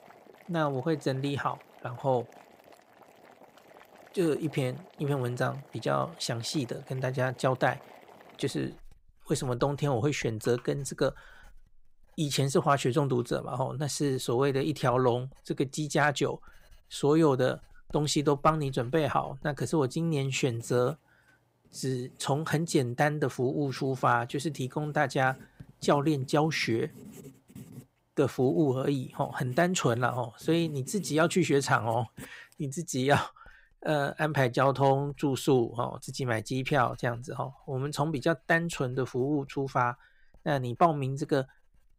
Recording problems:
household noises; faint; throughout; 25 dB below the speech

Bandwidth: 15.5 kHz